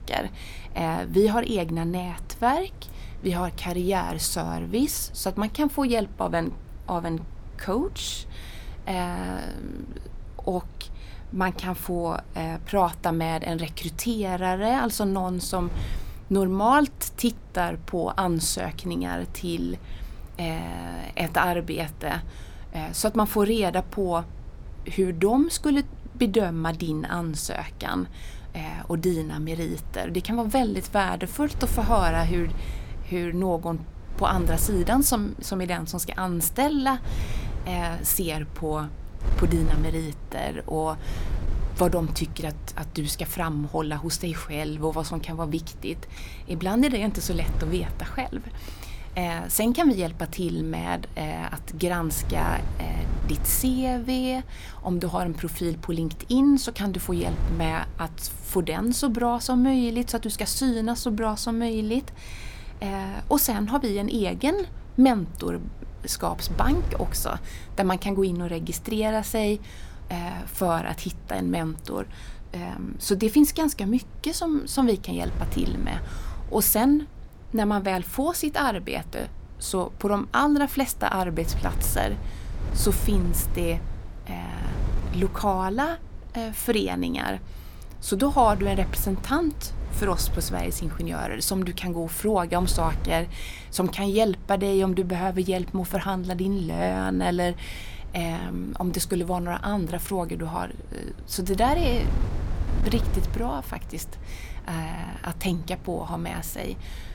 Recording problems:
wind noise on the microphone; occasional gusts; 20 dB below the speech

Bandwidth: 17.5 kHz